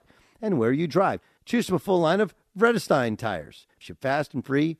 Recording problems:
none

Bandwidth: 13.5 kHz